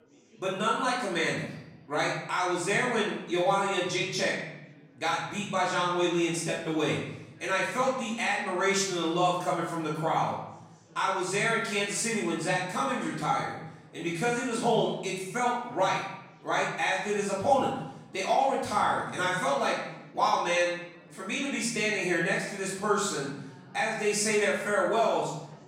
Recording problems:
off-mic speech; far
room echo; noticeable; dies away in 0.8 s
chatter from many people; faint; throughout; 25 dB below the speech

